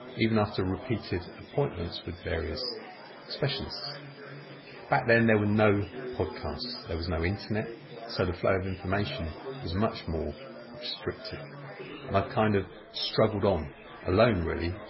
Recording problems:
garbled, watery; badly; nothing above 5.5 kHz
chatter from many people; noticeable; throughout; 15 dB below the speech
animal sounds; faint; throughout; 20 dB below the speech

